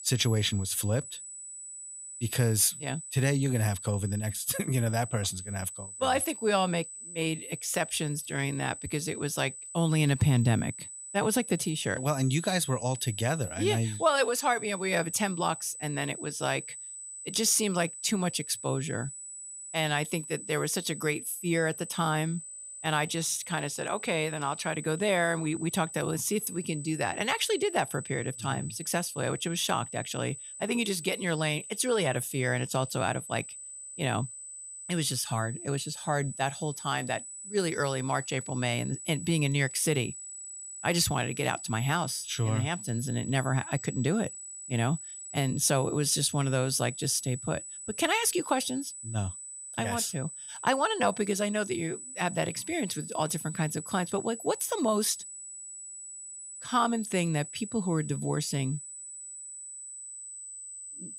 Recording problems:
high-pitched whine; noticeable; throughout; 8 kHz, 10 dB below the speech

